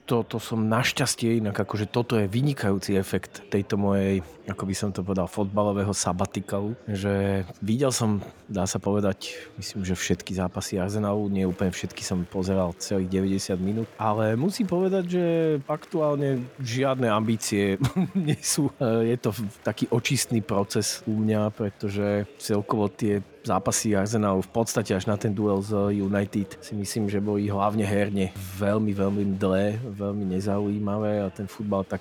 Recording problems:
murmuring crowd; faint; throughout; 25 dB below the speech

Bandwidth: 18.5 kHz